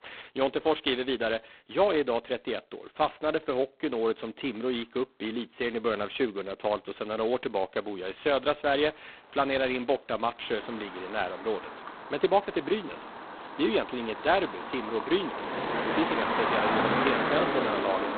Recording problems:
phone-call audio; poor line; nothing above 4 kHz
traffic noise; loud; throughout; 2 dB below the speech

